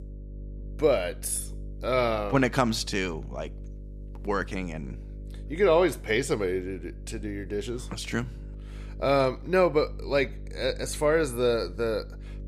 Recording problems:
electrical hum; faint; throughout; 50 Hz, 25 dB below the speech

